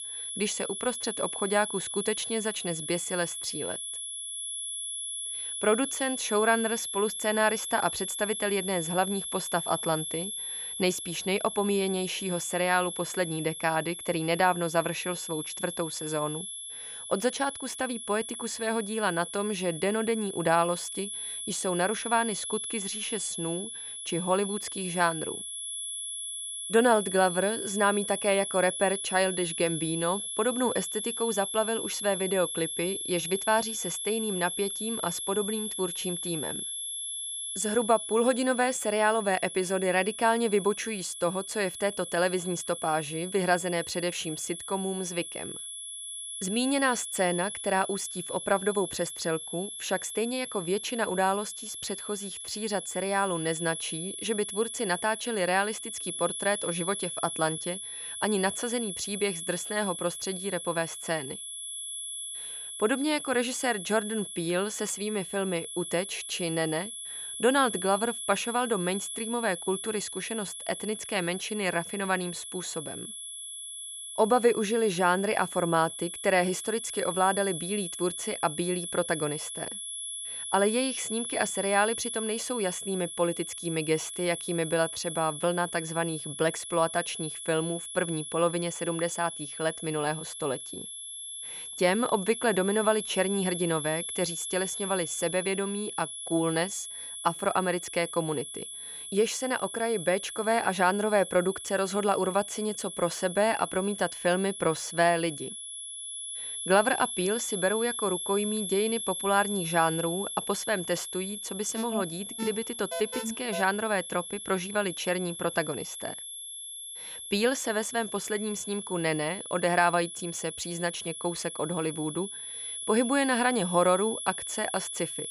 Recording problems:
high-pitched whine; loud; throughout; 11 kHz, 6 dB below the speech
alarm; noticeable; from 1:52 to 1:54; peak 6 dB below the speech

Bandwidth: 14.5 kHz